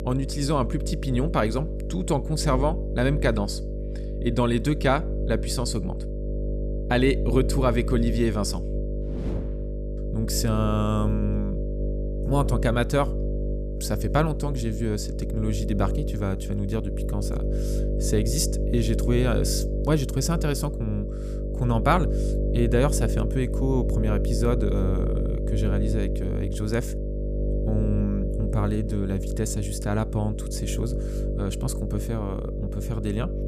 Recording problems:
electrical hum; loud; throughout; 50 Hz, 7 dB below the speech

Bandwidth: 14.5 kHz